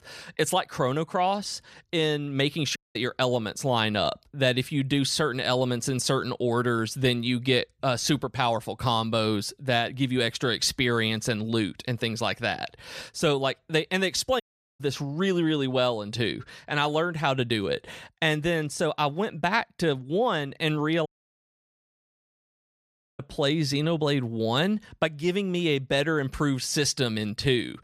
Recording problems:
audio cutting out; at 3 s, at 14 s and at 21 s for 2 s

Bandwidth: 14.5 kHz